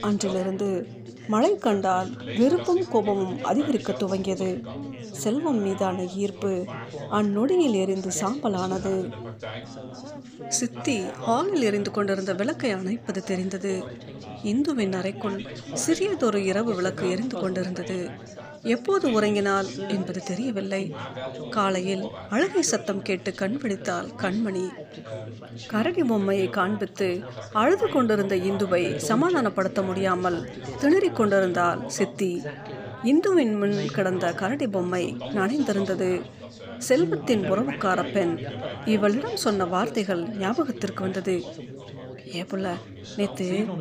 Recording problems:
chatter from many people; noticeable; throughout; 10 dB below the speech

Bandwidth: 15 kHz